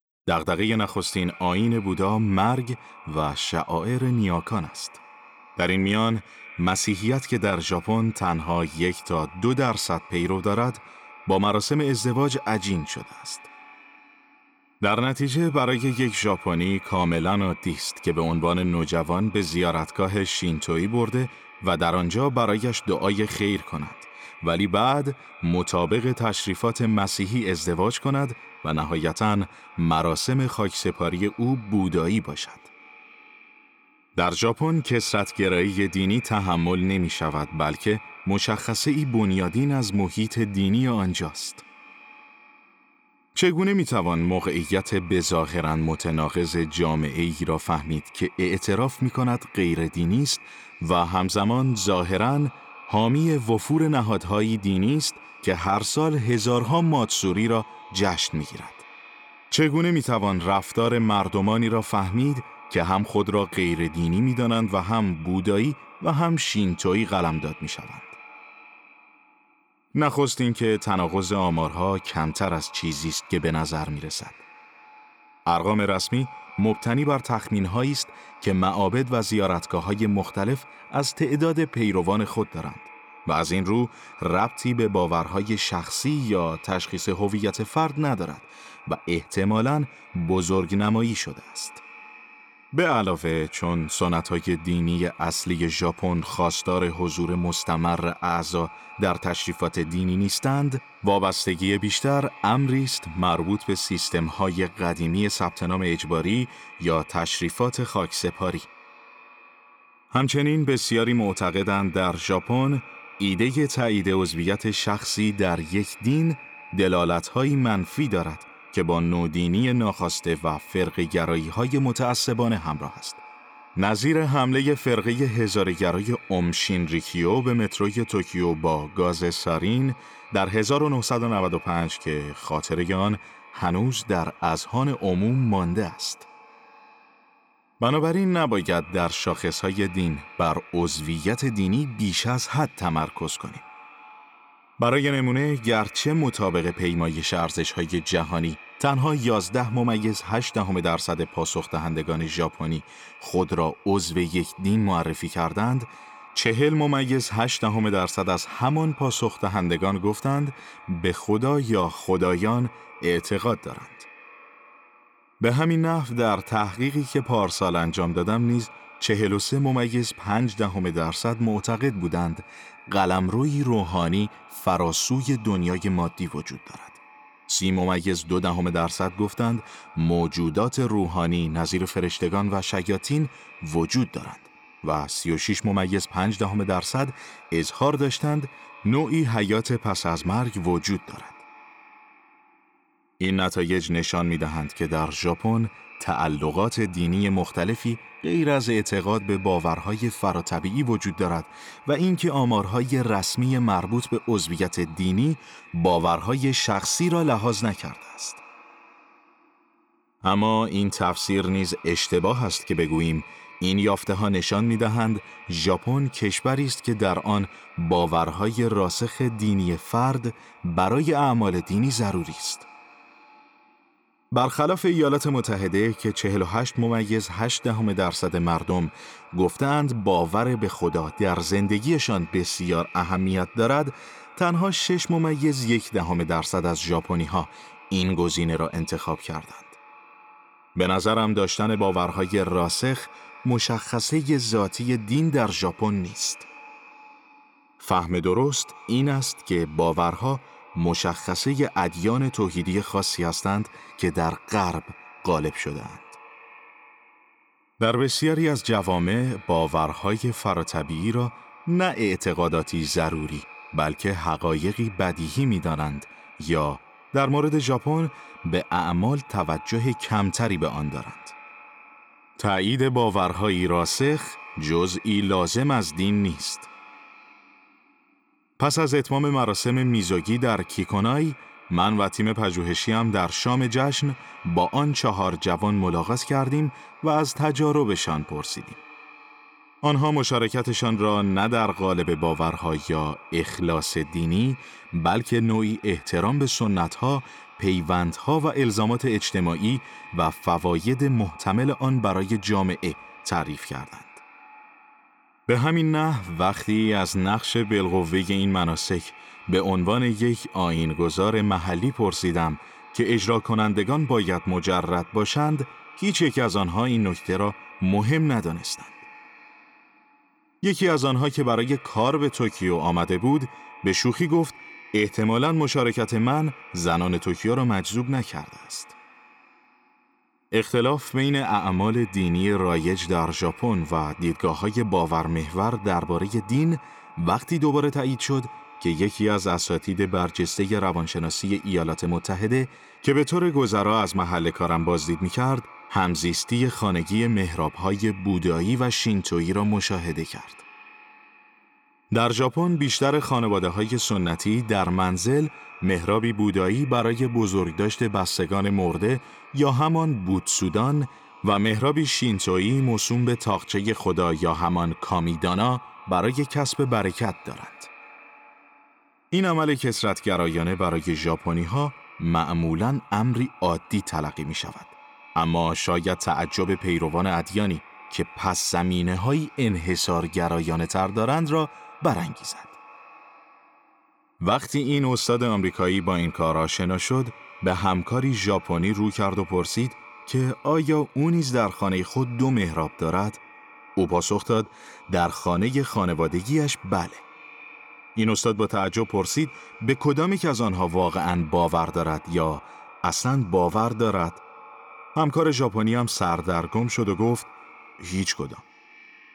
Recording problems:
echo of what is said; faint; throughout; 200 ms later, 20 dB below the speech

